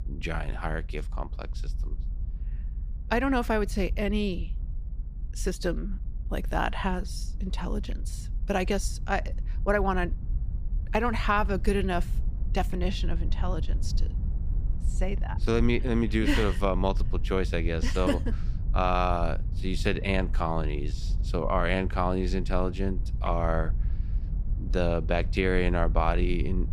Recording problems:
low rumble; faint; throughout; 20 dB below the speech

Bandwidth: 15 kHz